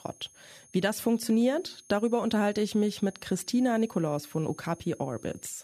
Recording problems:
high-pitched whine; faint; throughout; 6.5 kHz, 25 dB below the speech

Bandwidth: 14.5 kHz